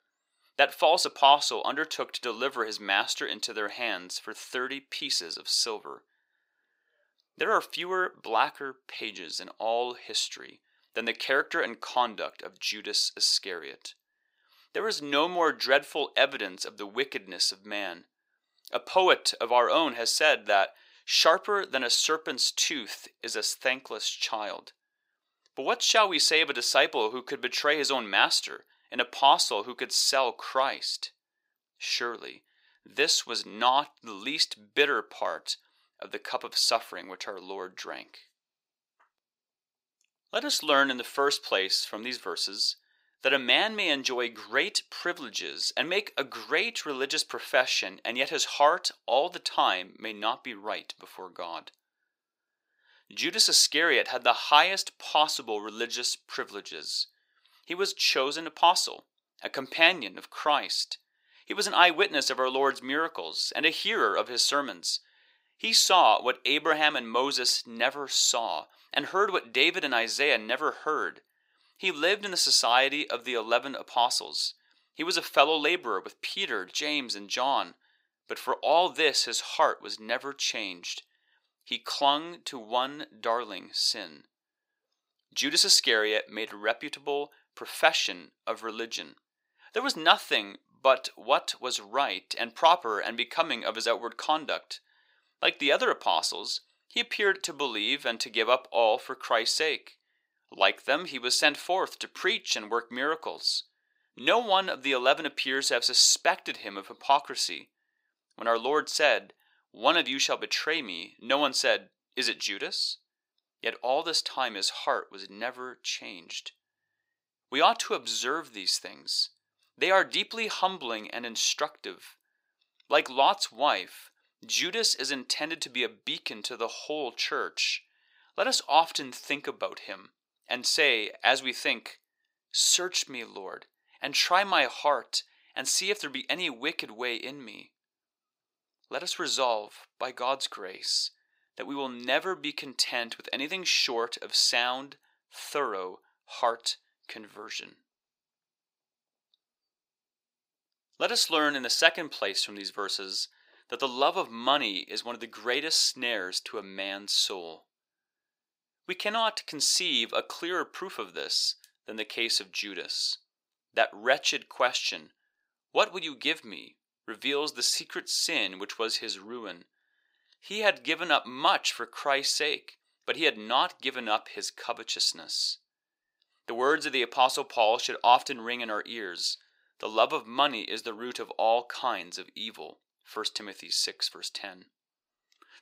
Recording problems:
thin; very; fading below 650 Hz

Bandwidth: 15.5 kHz